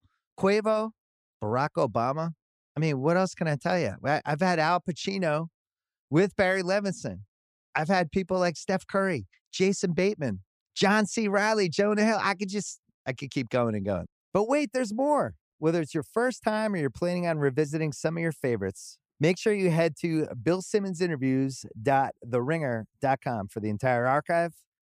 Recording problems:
none

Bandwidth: 15 kHz